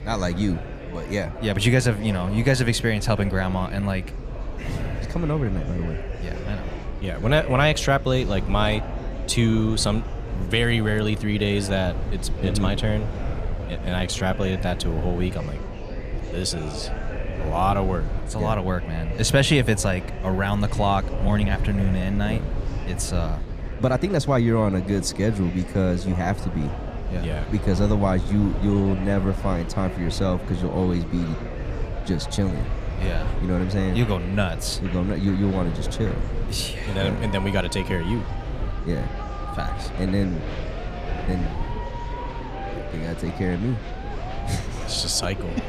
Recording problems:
murmuring crowd; noticeable; throughout; 10 dB below the speech
low rumble; noticeable; throughout; 20 dB below the speech
uneven, jittery; strongly; from 7 to 41 s

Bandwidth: 14.5 kHz